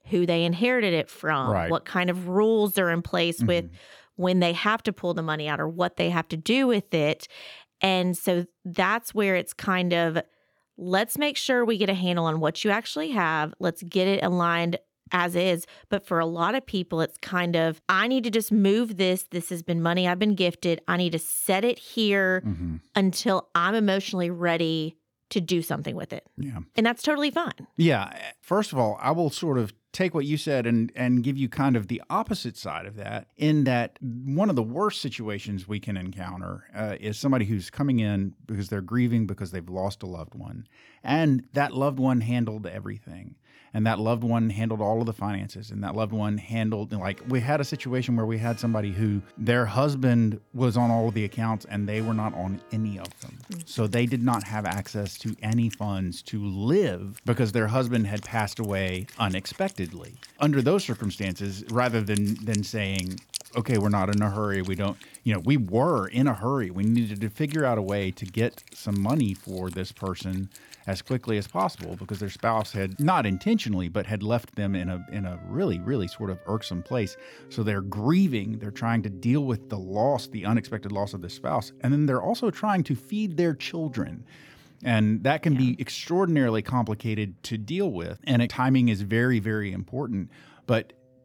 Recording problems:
background music; faint; from 47 s on; 20 dB below the speech

